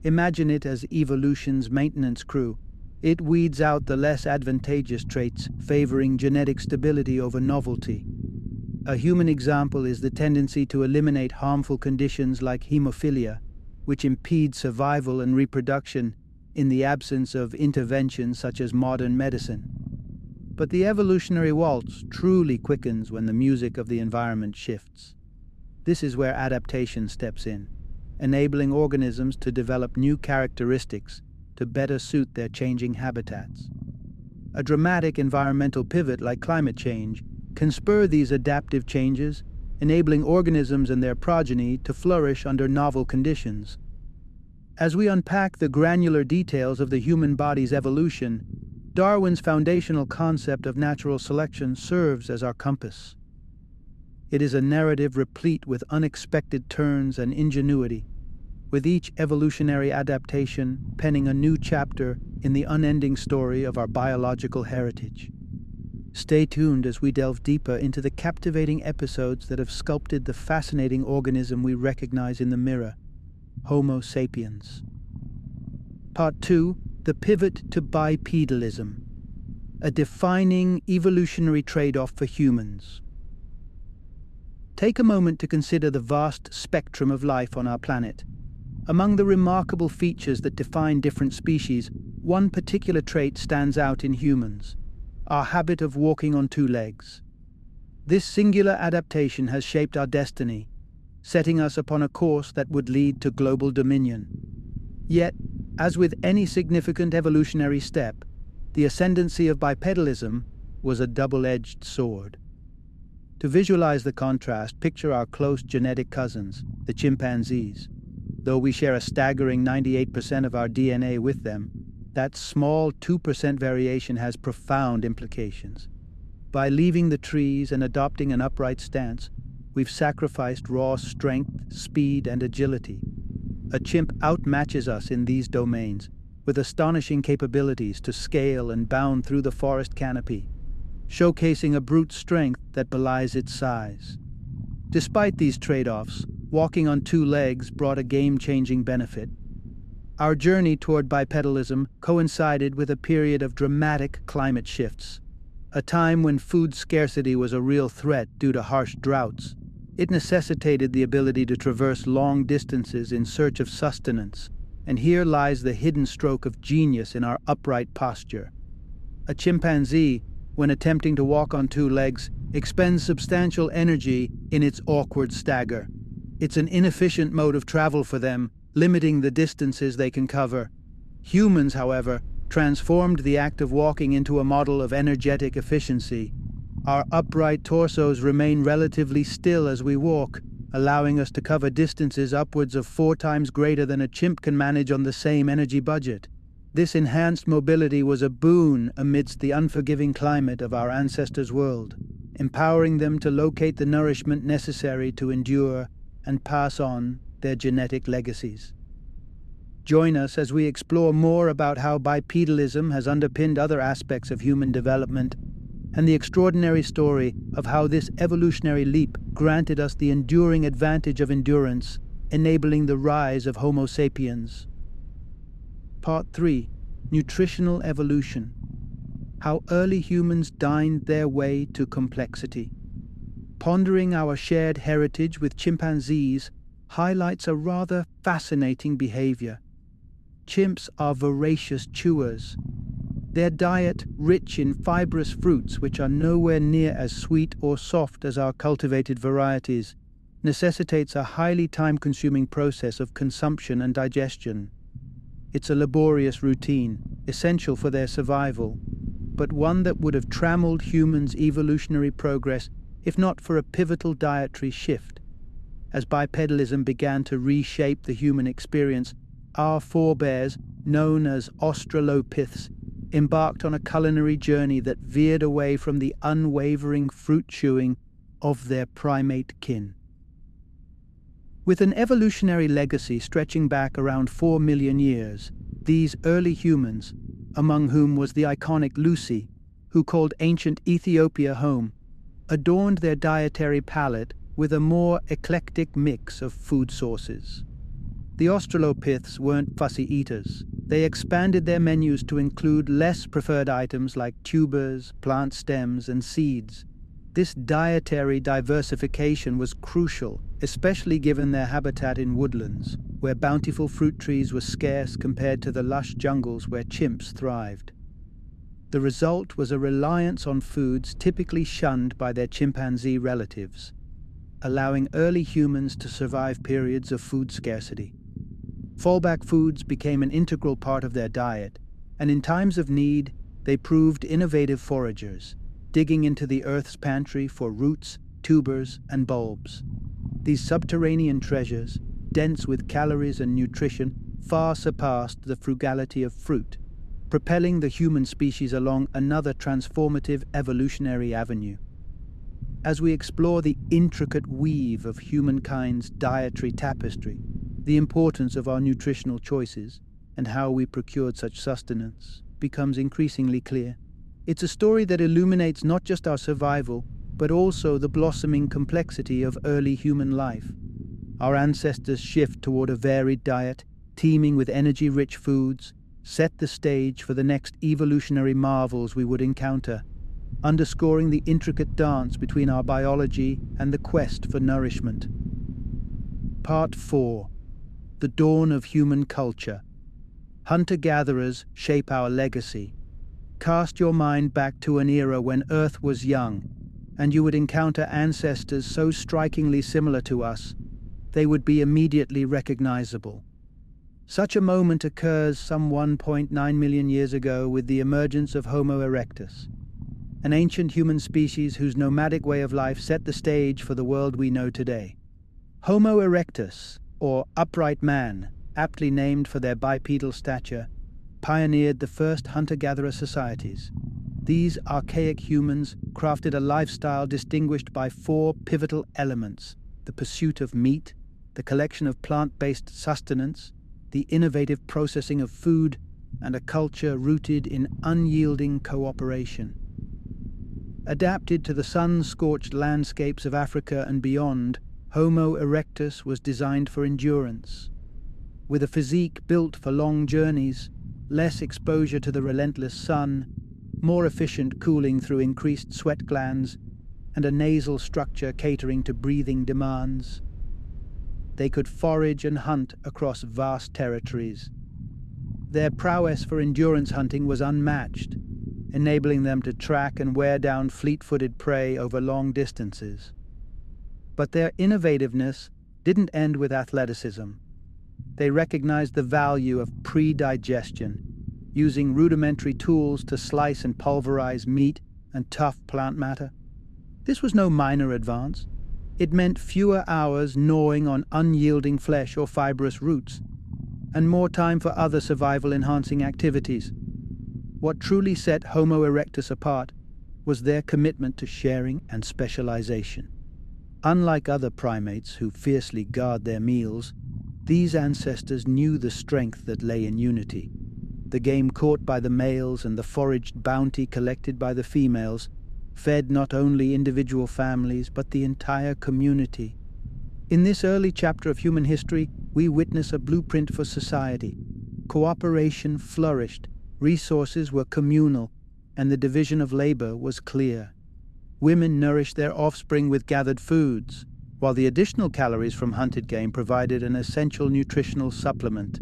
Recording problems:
low rumble; faint; throughout; 20 dB below the speech

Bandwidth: 13.5 kHz